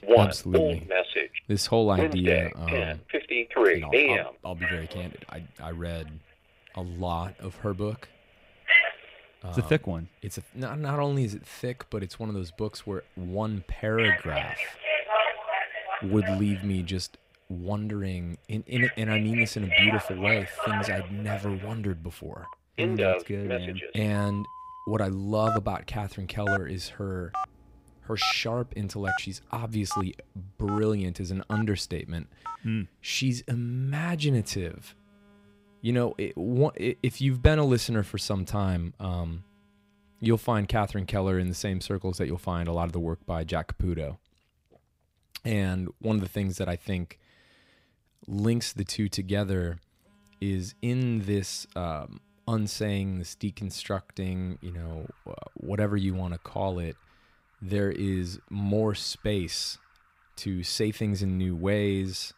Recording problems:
alarms or sirens; very loud; throughout; 3 dB above the speech

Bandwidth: 15.5 kHz